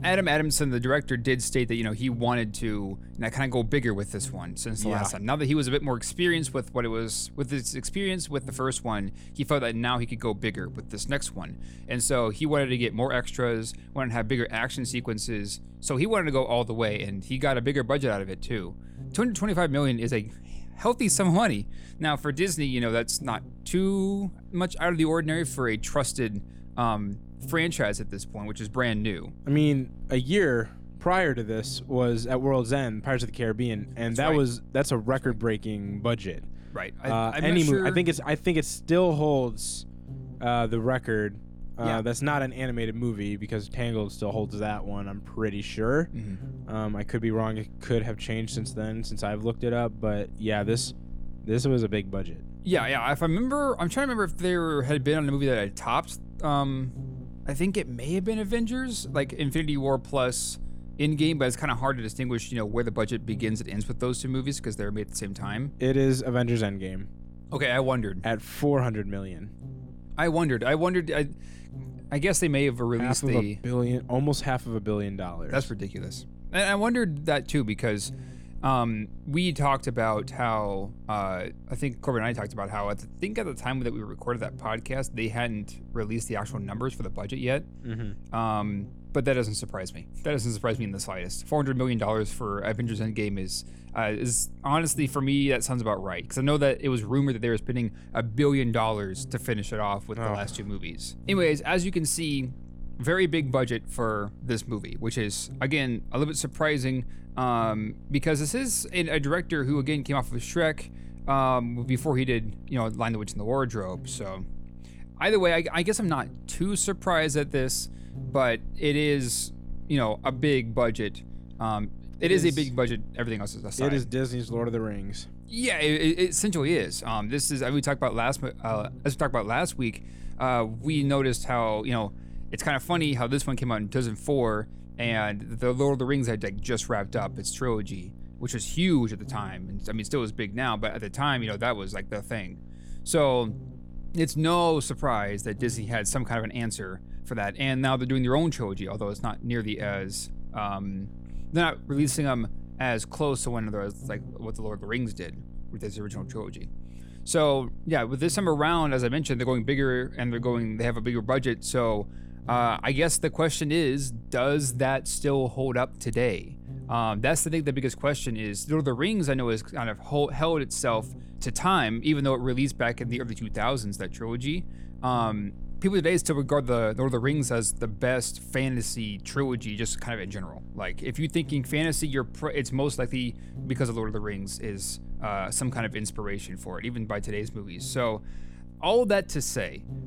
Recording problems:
electrical hum; faint; throughout; 60 Hz, 25 dB below the speech

